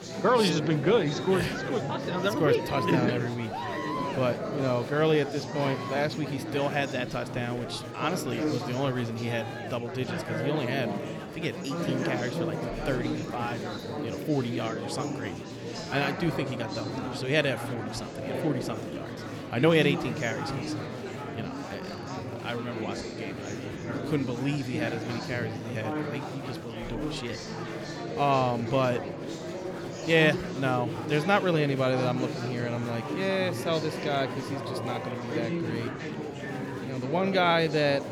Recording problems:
murmuring crowd; loud; throughout; 5 dB below the speech

